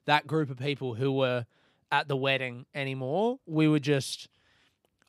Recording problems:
none

